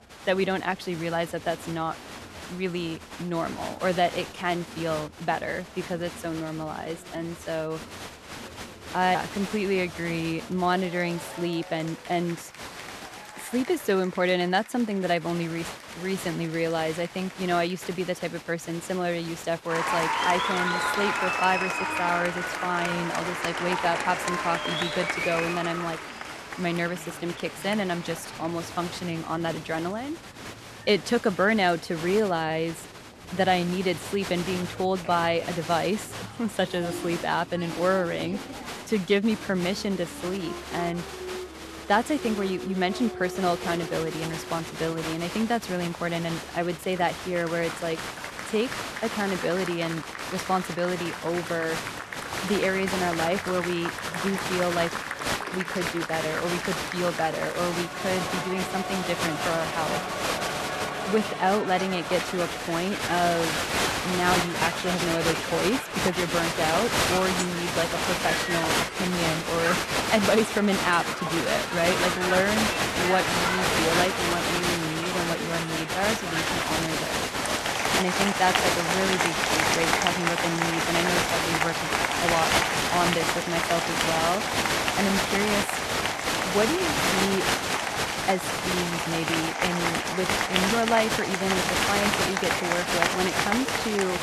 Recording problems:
crowd noise; very loud; throughout; as loud as the speech

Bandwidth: 13.5 kHz